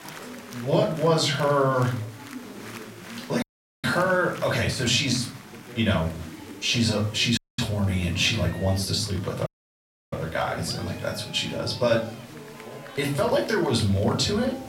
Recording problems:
off-mic speech; far
room echo; slight; dies away in 0.4 s
chatter from many people; noticeable; throughout; 15 dB below the speech
hiss; faint; throughout; 25 dB below the speech
audio cutting out; at 3.5 s, at 7.5 s and at 9.5 s for 0.5 s

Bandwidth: 16 kHz